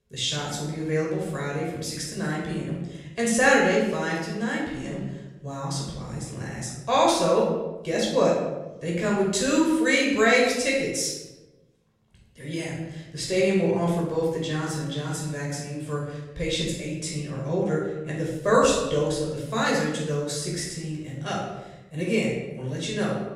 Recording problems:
off-mic speech; far
room echo; noticeable; dies away in 1 s

